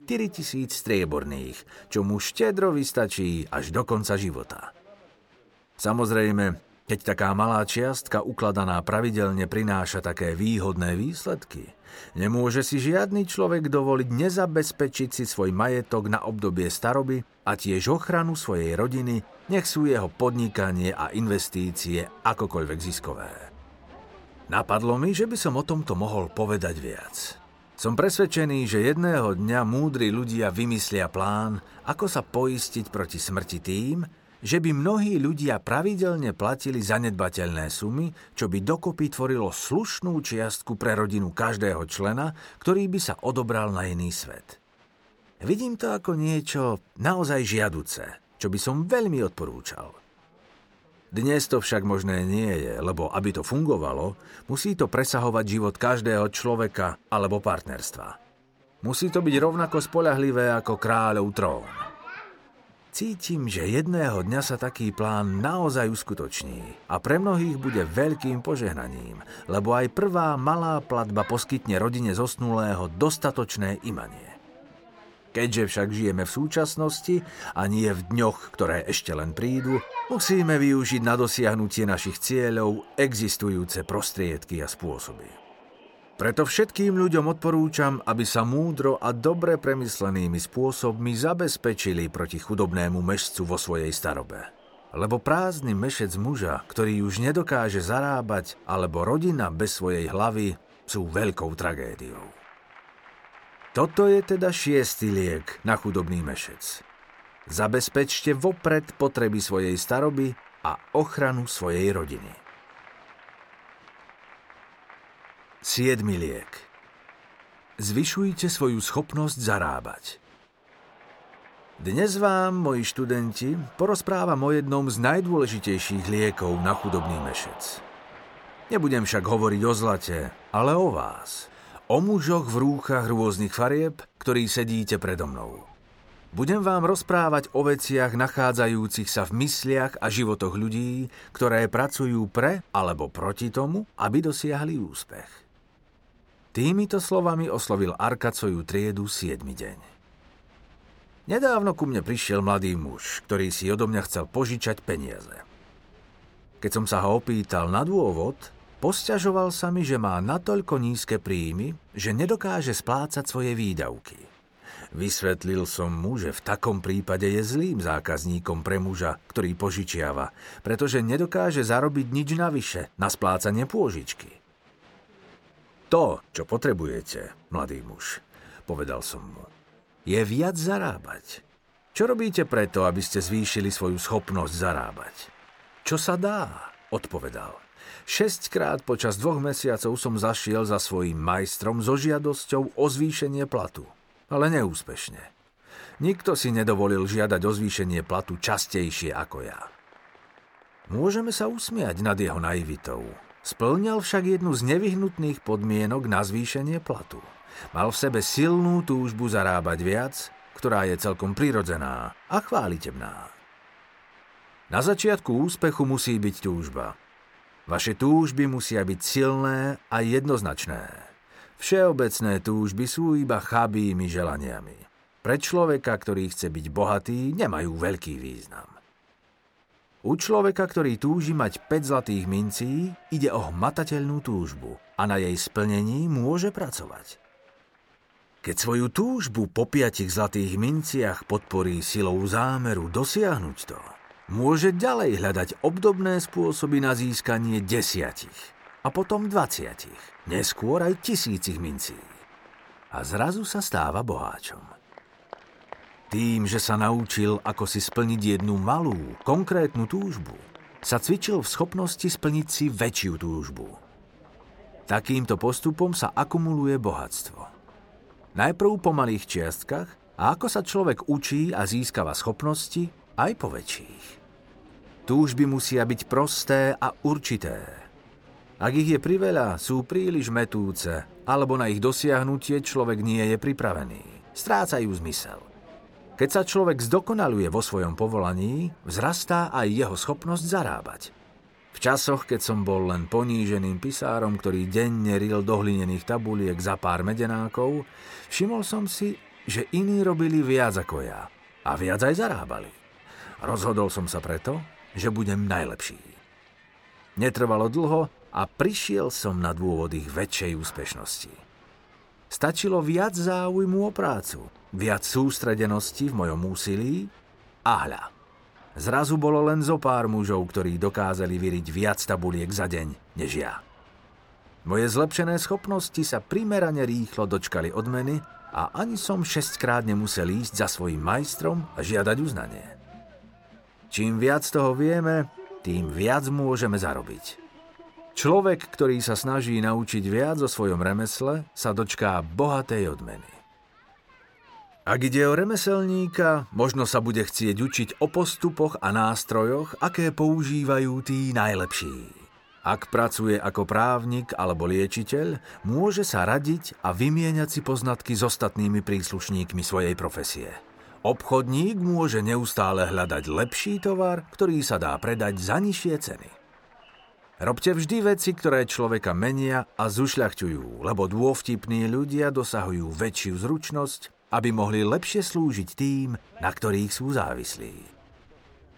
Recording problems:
crowd noise; faint; throughout; 25 dB below the speech

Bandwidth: 17 kHz